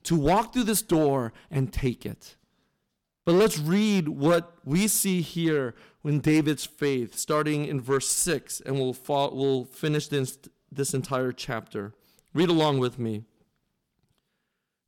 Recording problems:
distortion; slight; 3% of the sound clipped

